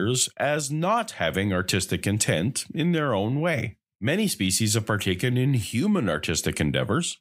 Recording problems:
abrupt cut into speech; at the start

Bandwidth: 15.5 kHz